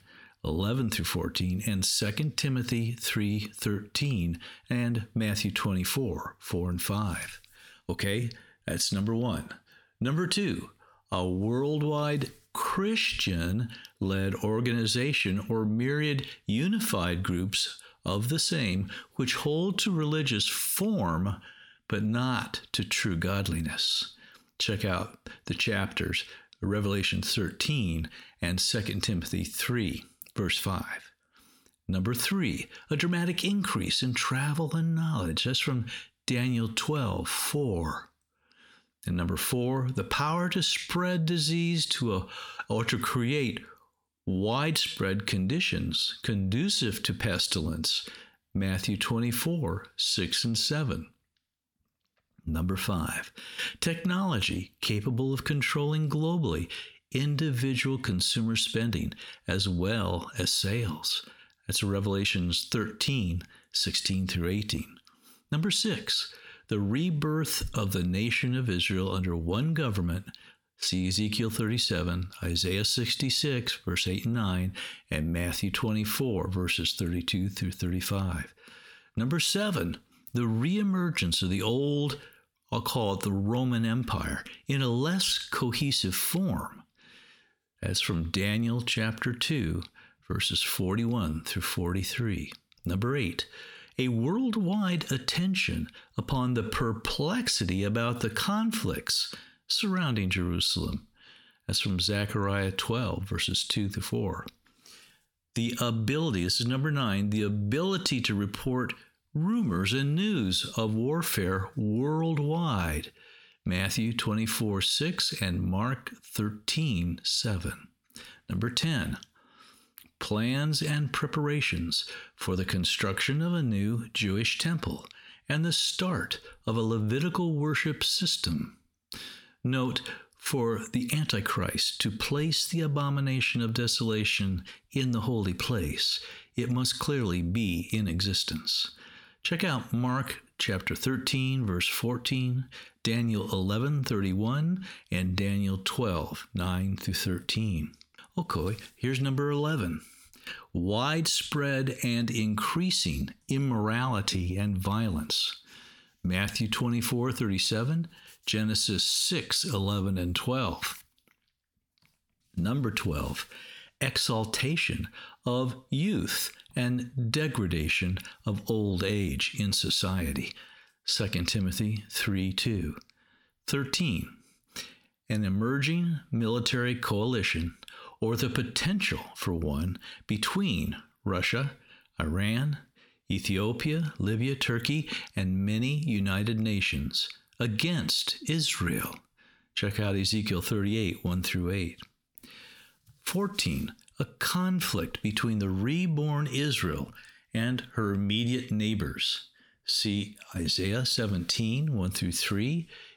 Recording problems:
squashed, flat; heavily

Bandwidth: 18 kHz